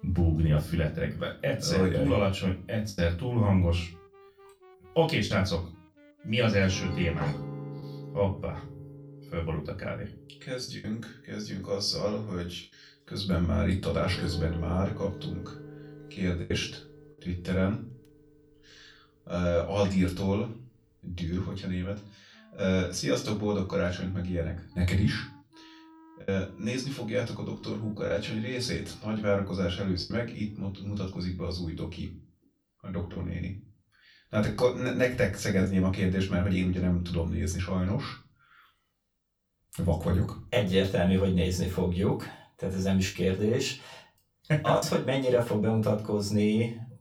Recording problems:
off-mic speech; far
room echo; very slight; dies away in 0.3 s
background music; noticeable; until 31 s; 15 dB below the speech
choppy; occasionally; 2% of the speech affected

